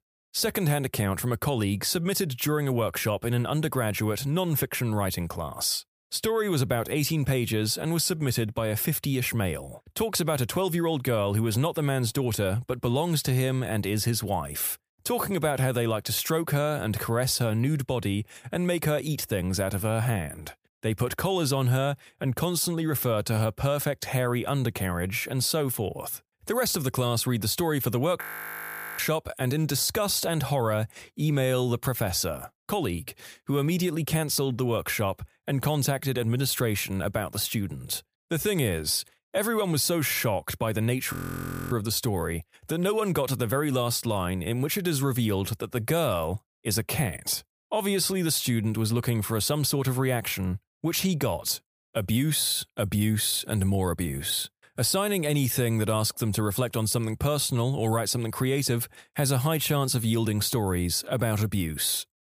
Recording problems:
audio freezing; at 28 s for 1 s and at 41 s for 0.5 s

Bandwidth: 15 kHz